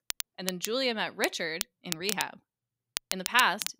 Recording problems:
crackle, like an old record; loud; 6 dB below the speech

